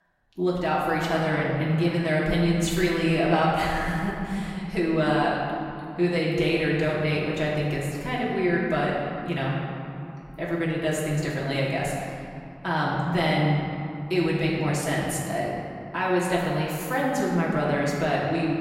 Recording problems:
off-mic speech; far
room echo; noticeable; dies away in 2.5 s

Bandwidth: 16 kHz